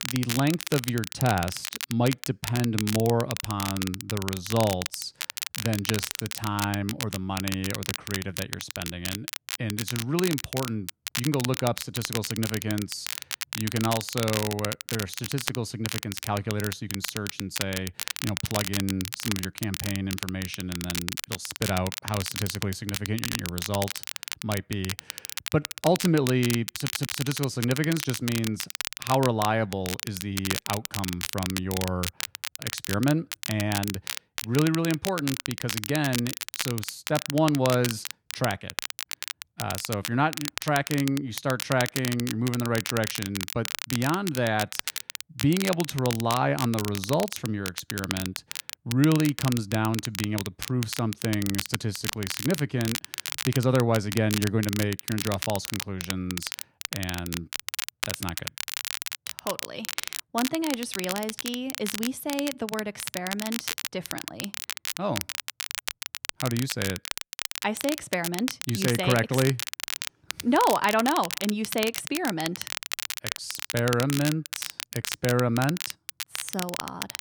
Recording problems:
crackle, like an old record; loud; 4 dB below the speech
audio stuttering; at 23 s and at 27 s

